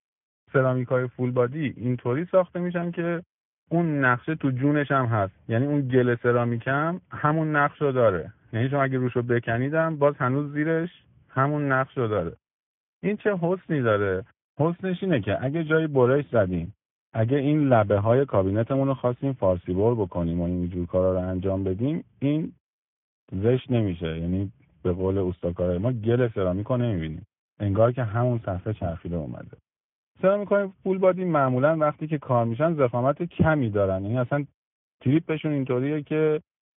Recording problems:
high frequencies cut off; severe; nothing above 3.5 kHz
garbled, watery; slightly

